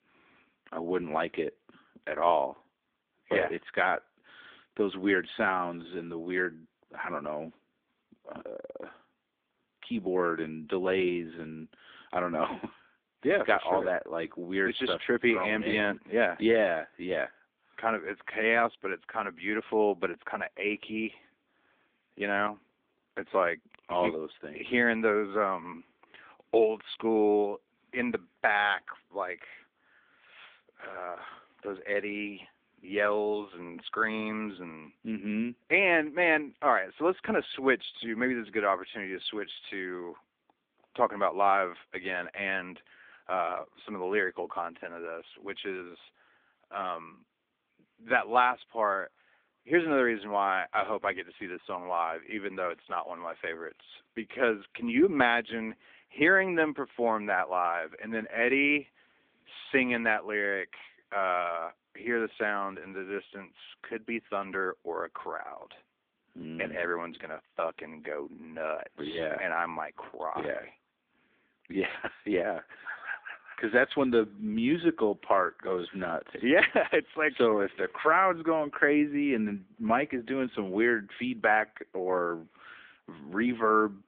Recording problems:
phone-call audio

